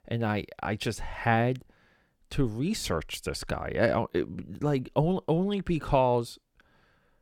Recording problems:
none

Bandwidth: 18 kHz